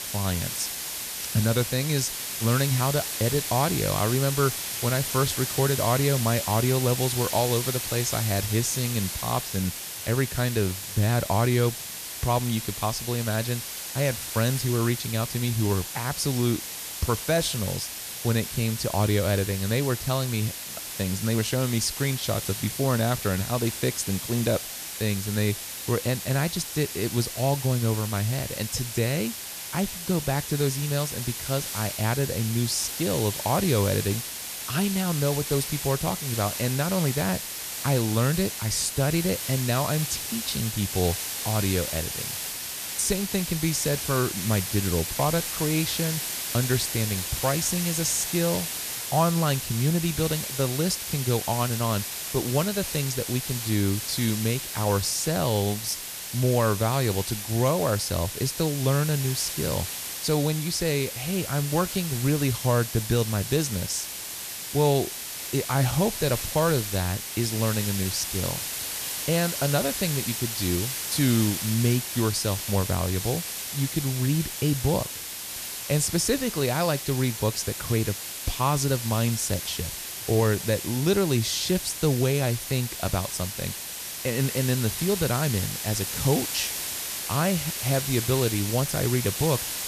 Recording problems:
hiss; loud; throughout; 4 dB below the speech

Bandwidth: 14.5 kHz